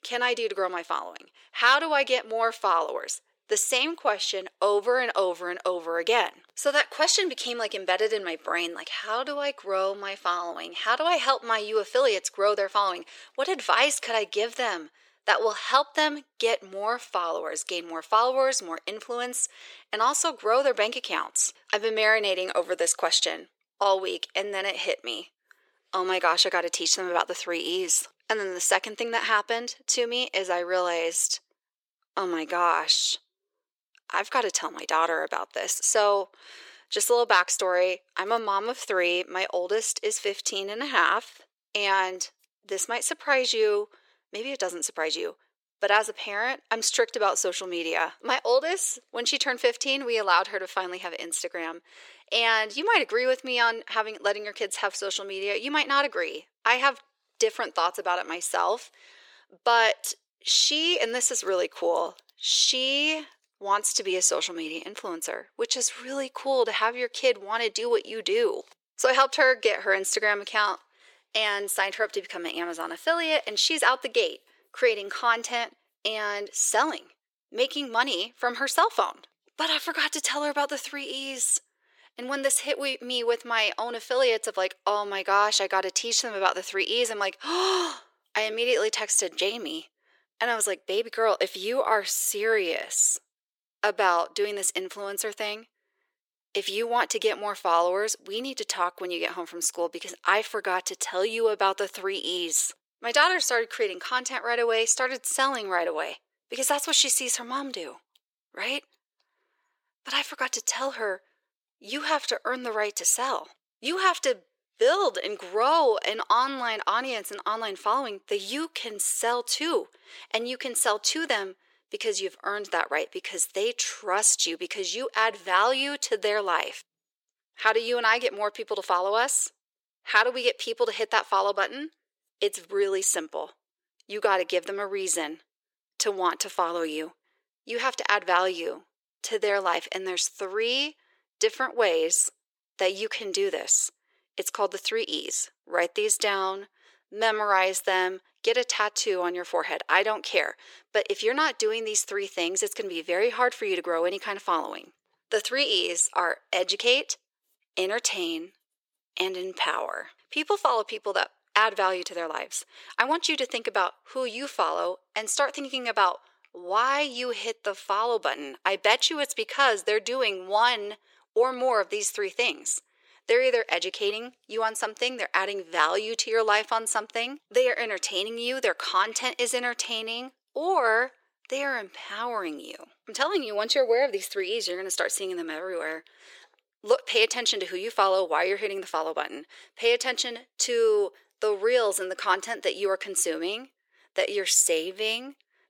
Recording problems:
thin; very; fading below 450 Hz

